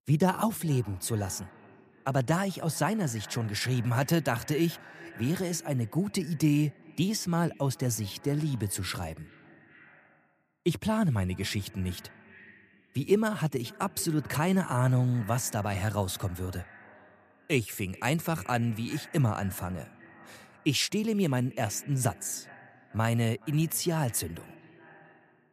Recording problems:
echo of what is said; faint; throughout; 420 ms later, 20 dB below the speech

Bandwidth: 14.5 kHz